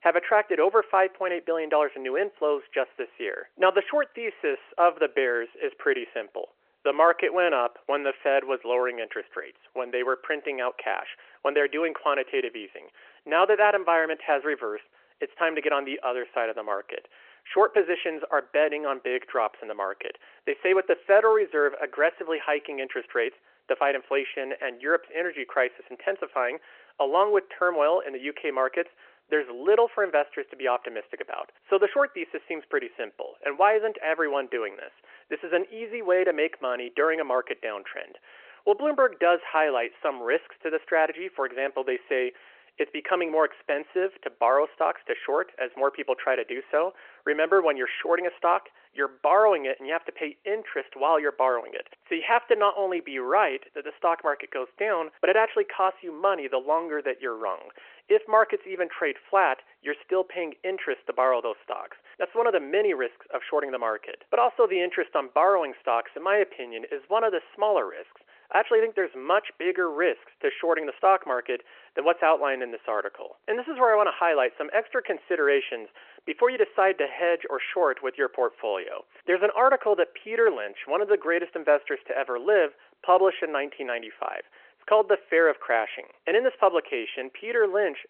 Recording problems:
phone-call audio

